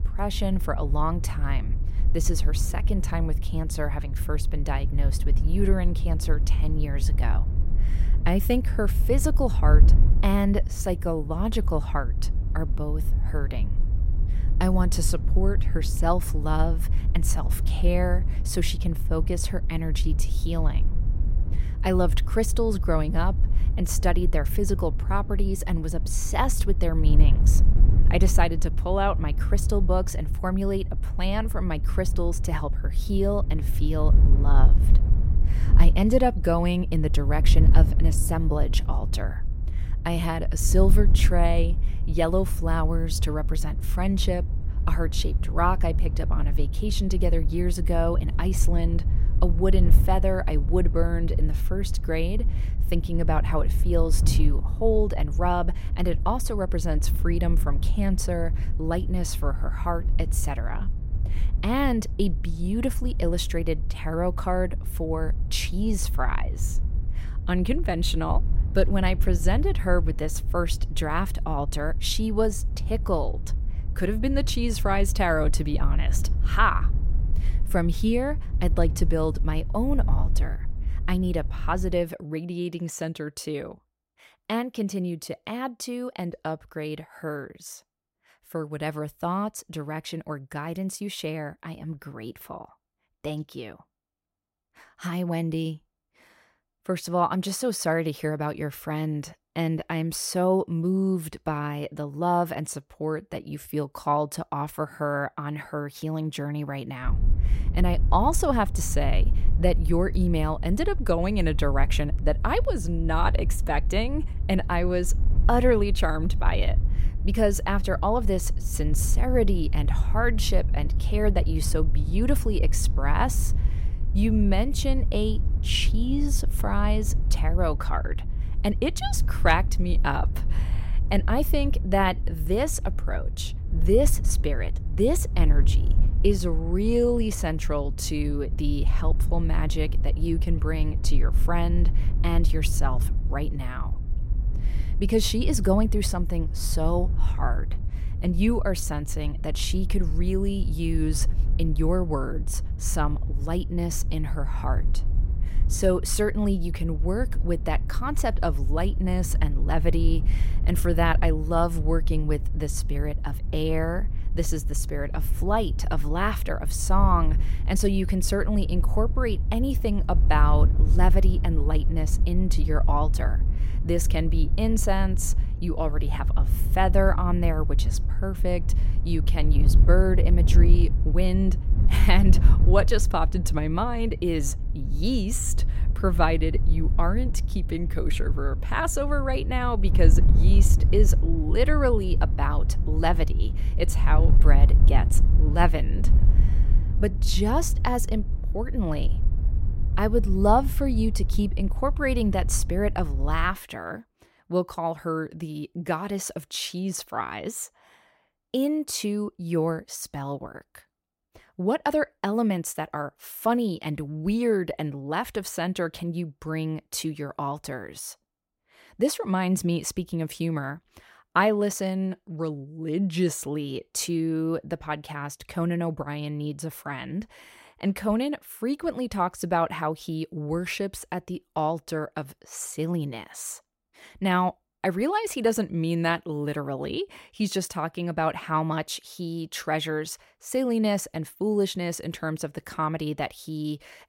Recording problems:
wind noise on the microphone; occasional gusts; until 1:22 and from 1:47 to 3:24; 15 dB below the speech

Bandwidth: 16 kHz